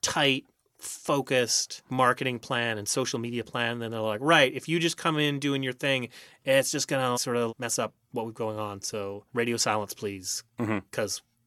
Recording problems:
none

